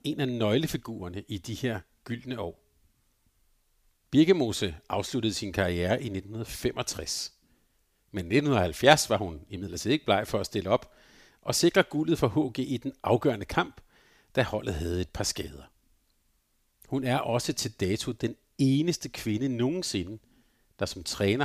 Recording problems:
abrupt cut into speech; at the end

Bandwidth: 15 kHz